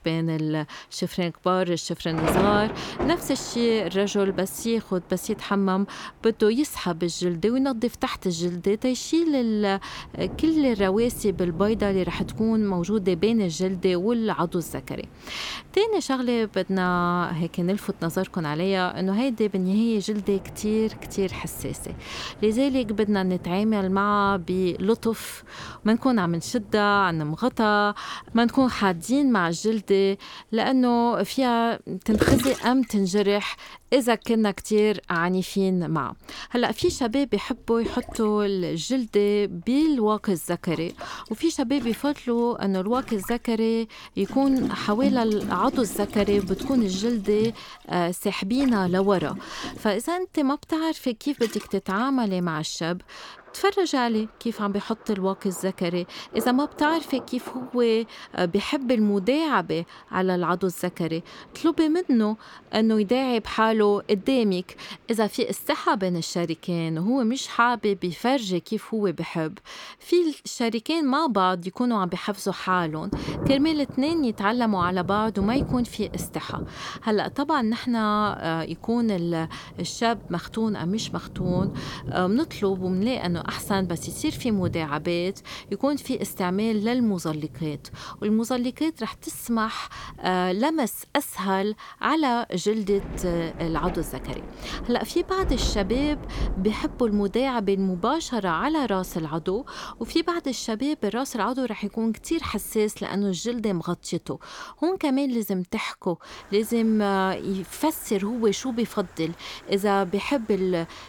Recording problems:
rain or running water; noticeable; throughout; 10 dB below the speech

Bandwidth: 18 kHz